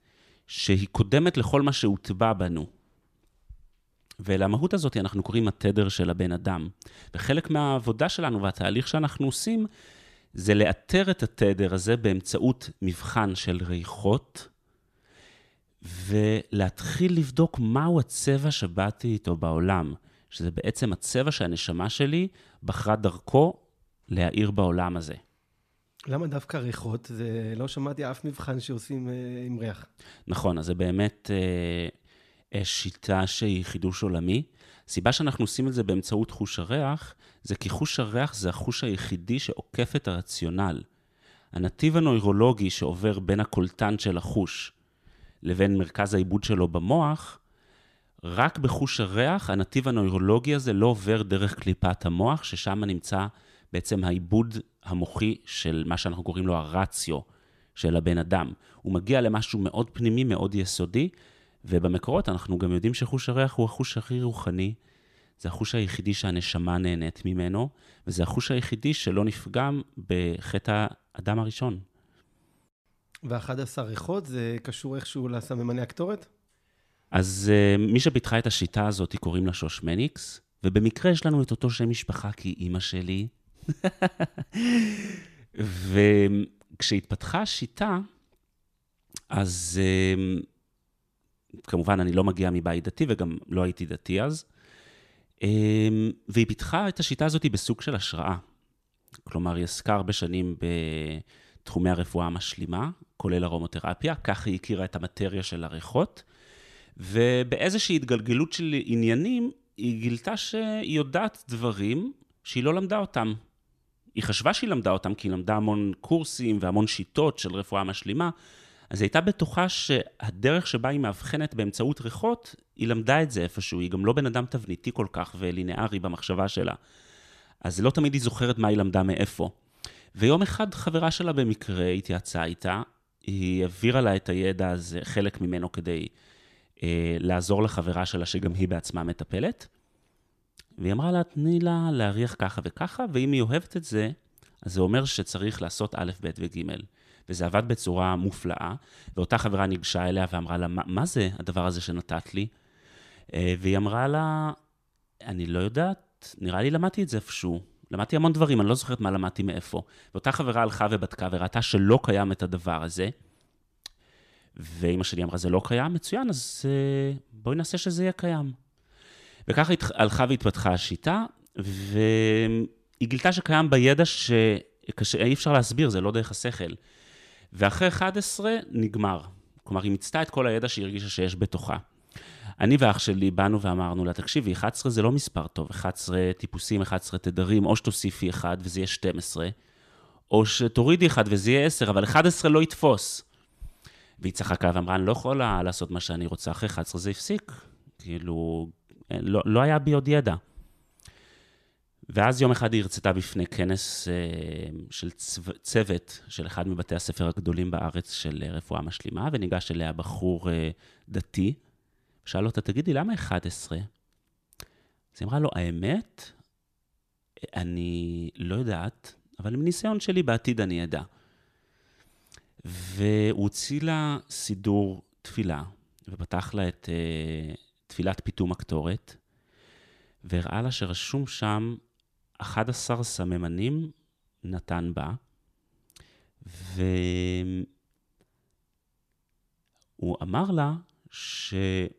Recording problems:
none

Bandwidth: 14.5 kHz